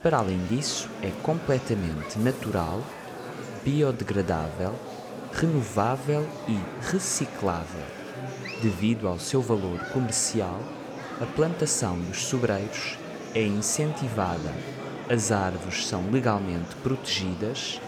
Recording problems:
murmuring crowd; loud; throughout; 10 dB below the speech

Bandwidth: 18.5 kHz